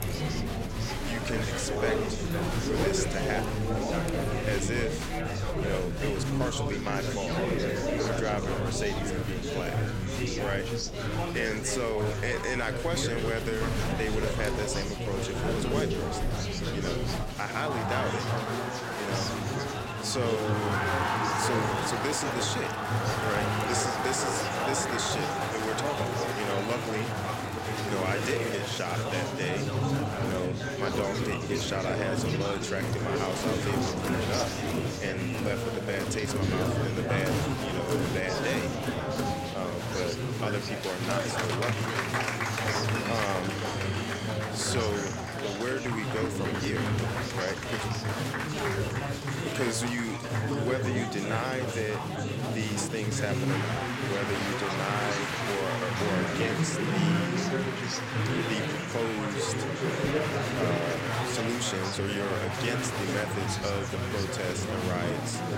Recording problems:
chatter from many people; very loud; throughout; 3 dB above the speech

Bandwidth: 16 kHz